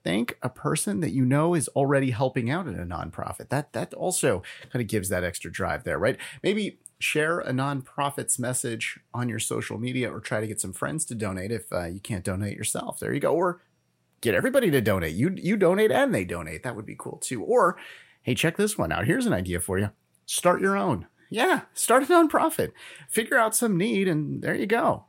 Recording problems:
none

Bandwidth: 16 kHz